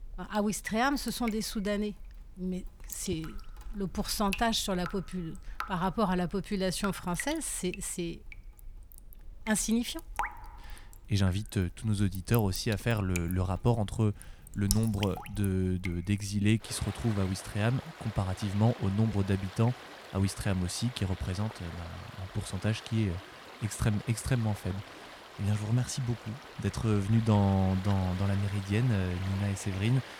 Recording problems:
rain or running water; noticeable; throughout; 15 dB below the speech

